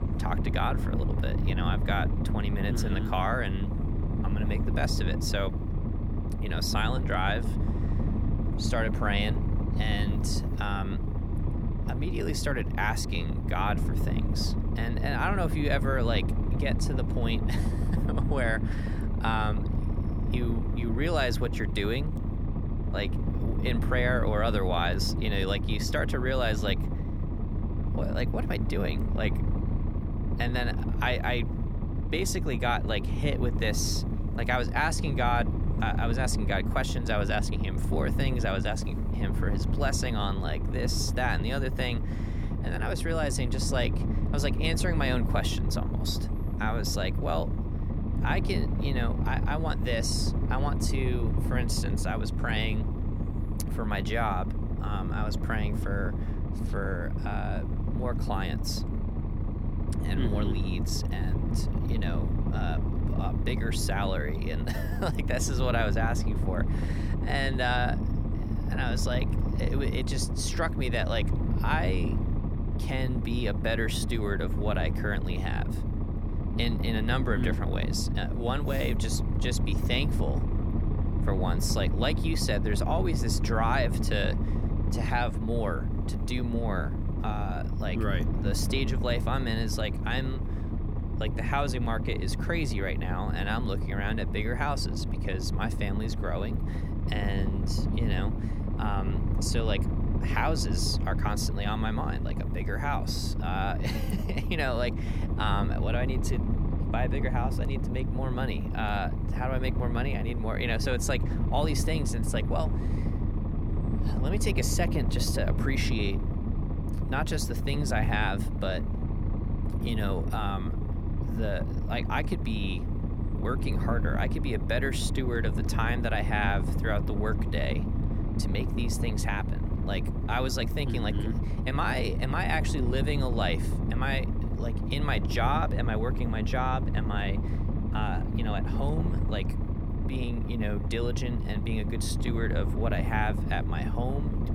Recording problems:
low rumble; loud; throughout; 8 dB below the speech

